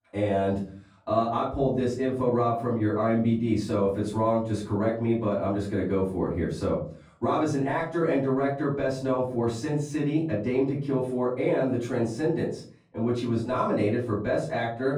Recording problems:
off-mic speech; far
muffled; slightly; fading above 2 kHz
room echo; slight; dies away in 0.4 s

